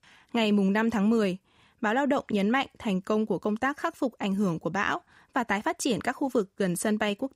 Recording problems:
none

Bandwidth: 15.5 kHz